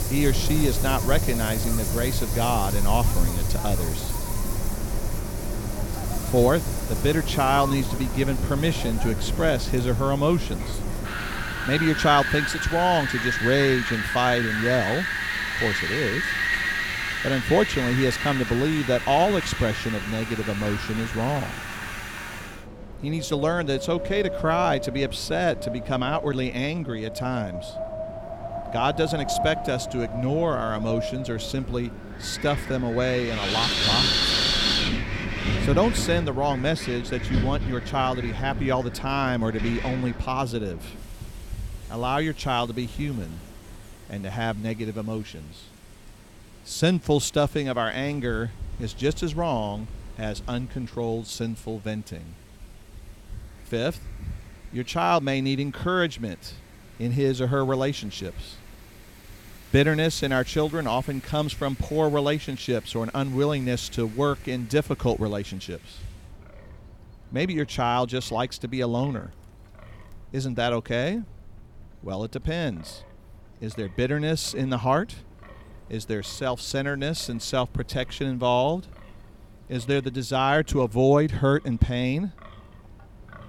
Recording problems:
wind in the background; loud; throughout; 3 dB below the speech

